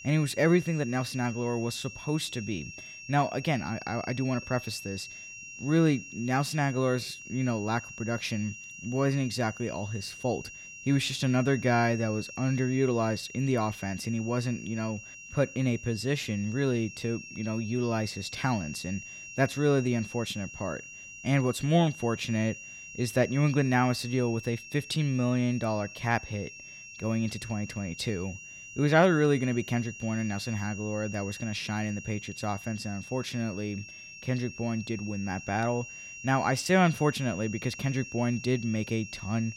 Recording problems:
high-pitched whine; noticeable; throughout; 2.5 kHz, 15 dB below the speech

